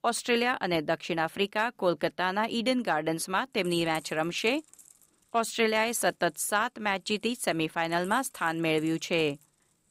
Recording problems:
household noises; faint; from 3.5 s on; 25 dB below the speech

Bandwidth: 15.5 kHz